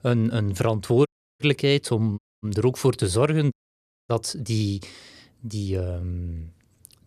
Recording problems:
audio cutting out; at 1 s, at 2 s and at 3.5 s for 0.5 s

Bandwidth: 14.5 kHz